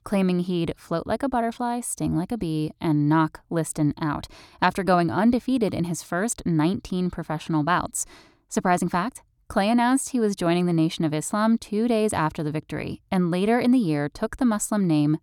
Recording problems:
none

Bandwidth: 18.5 kHz